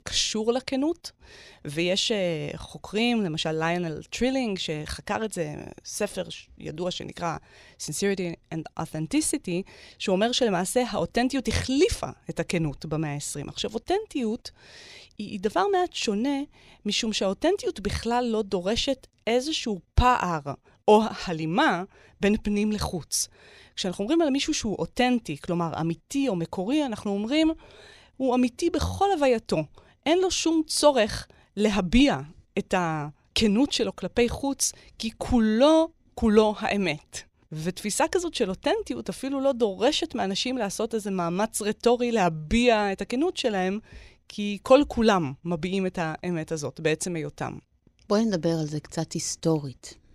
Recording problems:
none

